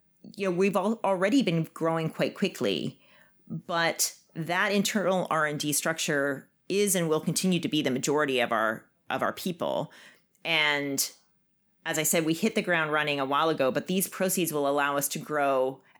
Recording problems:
none

